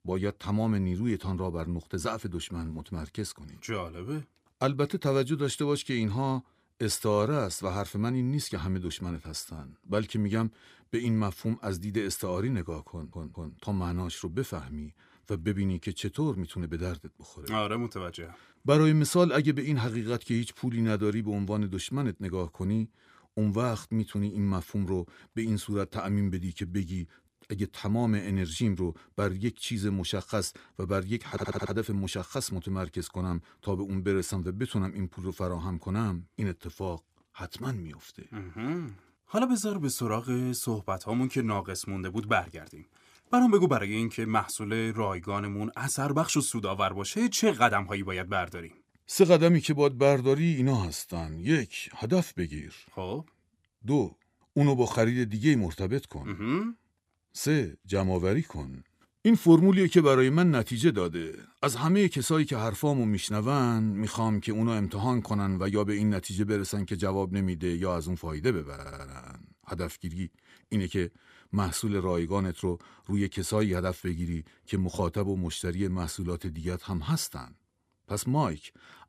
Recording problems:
audio stuttering; at 13 s, at 31 s and at 1:09

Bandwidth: 15 kHz